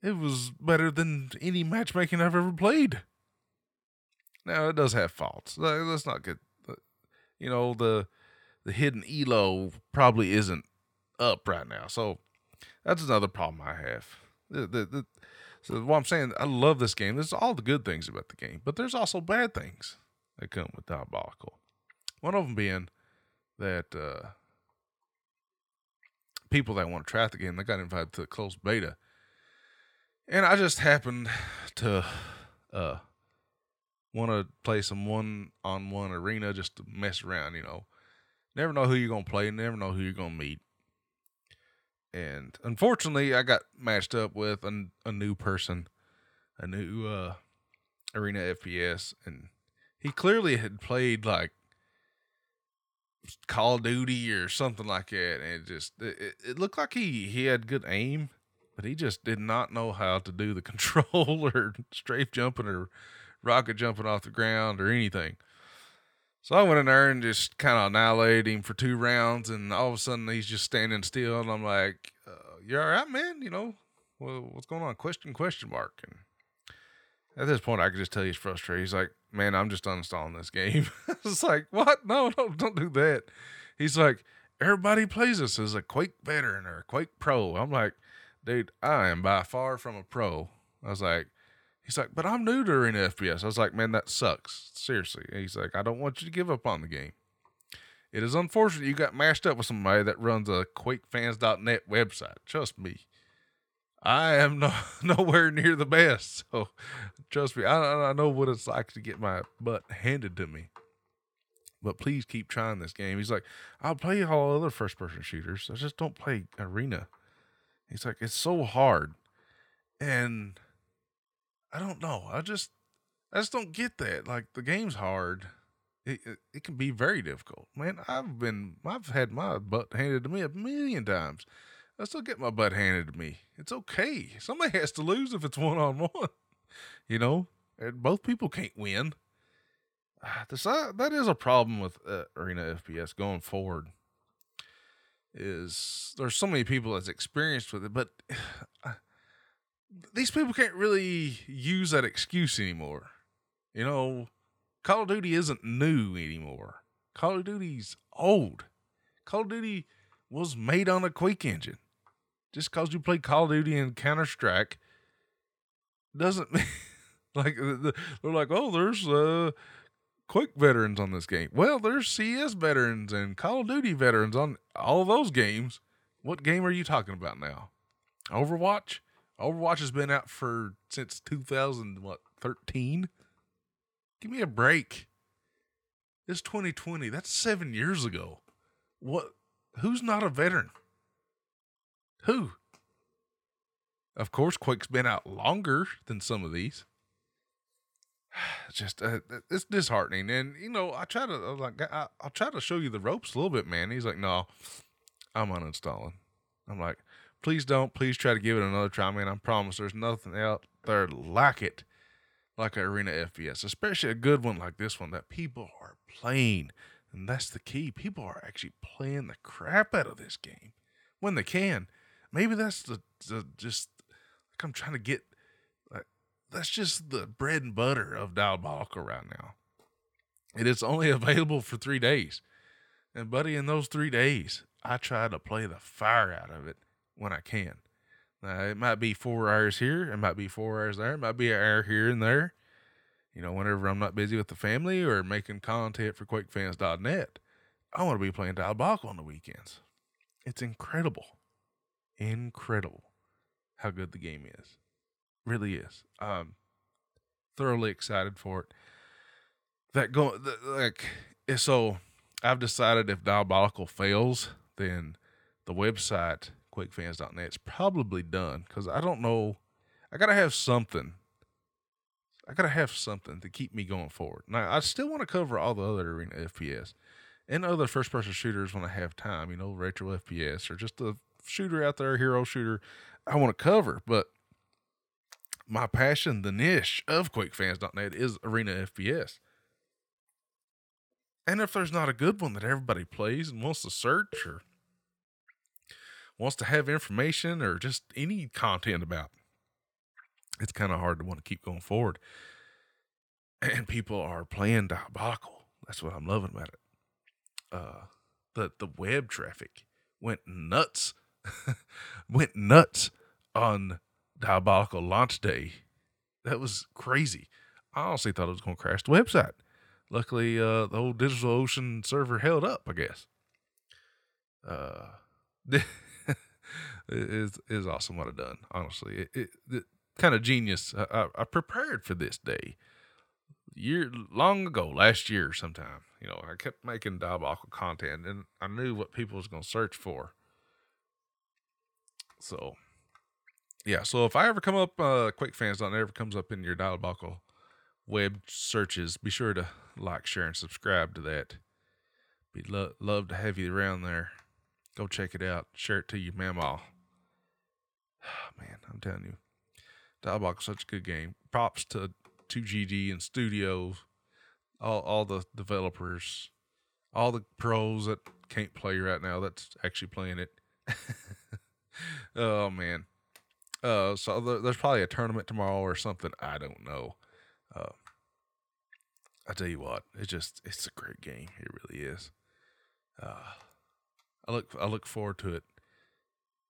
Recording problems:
none

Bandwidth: 18.5 kHz